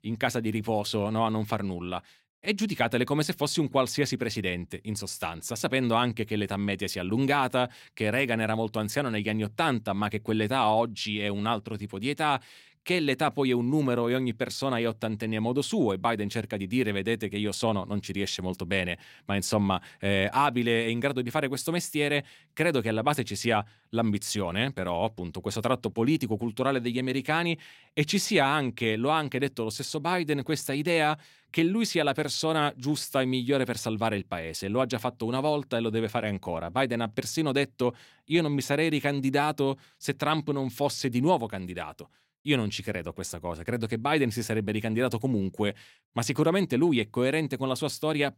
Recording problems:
none

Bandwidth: 16 kHz